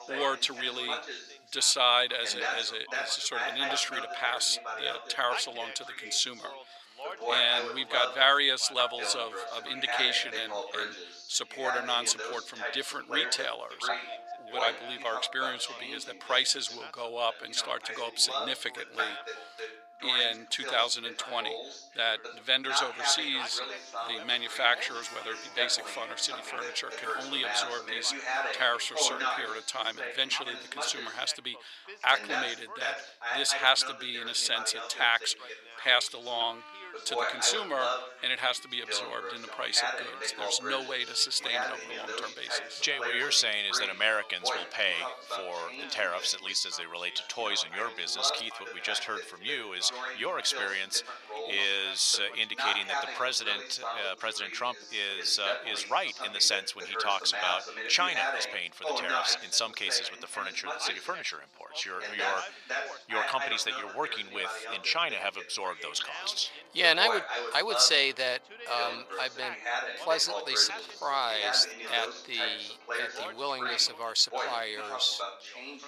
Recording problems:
thin; very; fading below 850 Hz
background chatter; loud; throughout; 2 voices, 8 dB below the speech
background music; noticeable; throughout; 20 dB below the speech

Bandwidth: 15 kHz